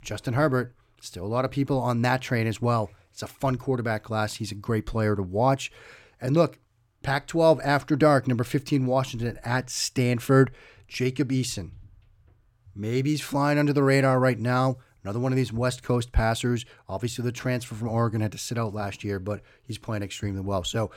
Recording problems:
none

